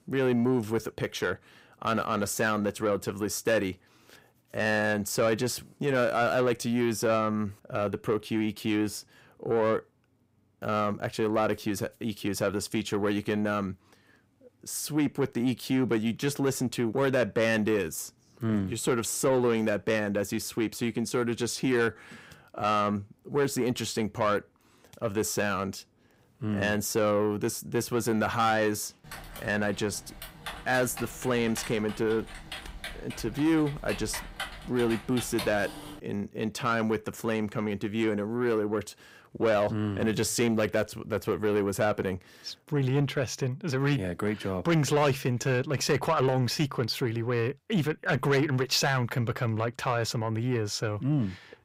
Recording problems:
distortion; slight; 10 dB below the speech
keyboard typing; noticeable; from 29 to 36 s; peak 8 dB below the speech

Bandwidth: 15.5 kHz